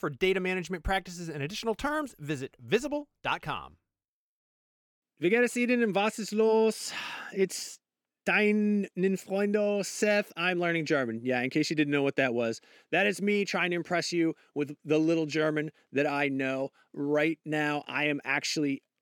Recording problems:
none

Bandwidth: 18 kHz